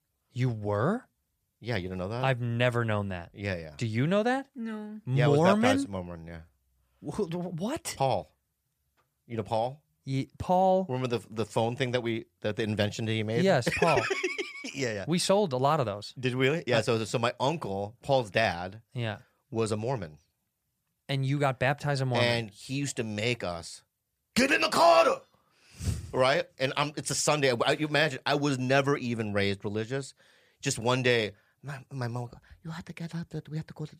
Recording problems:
none

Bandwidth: 14.5 kHz